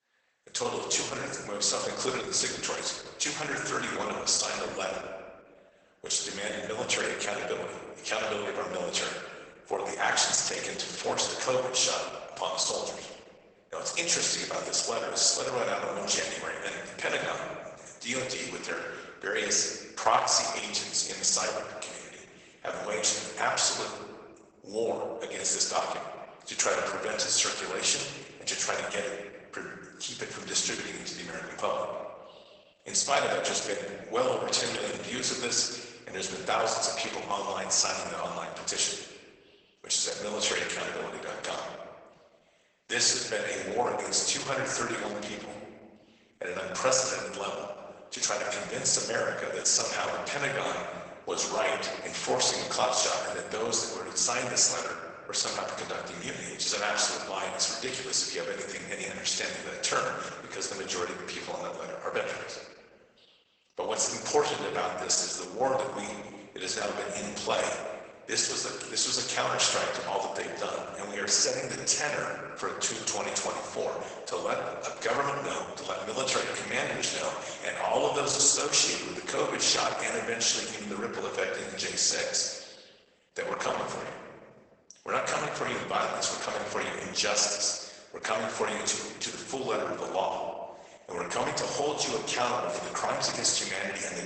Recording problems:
garbled, watery; badly; nothing above 8 kHz
thin; very; fading below 650 Hz
room echo; noticeable; dies away in 1.3 s
off-mic speech; somewhat distant

